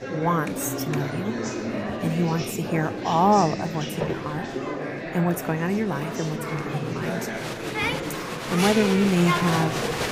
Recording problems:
murmuring crowd; loud; throughout; 4 dB below the speech
footsteps; noticeable; at 4 s; peak 6 dB below the speech
phone ringing; faint; at 7.5 s; peak 15 dB below the speech

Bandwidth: 15 kHz